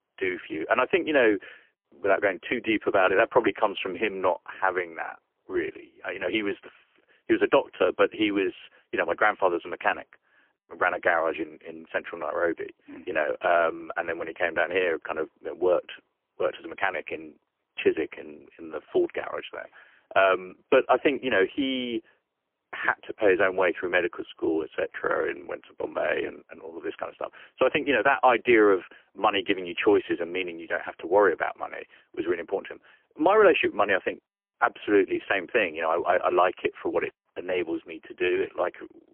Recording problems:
phone-call audio; poor line; nothing above 3 kHz

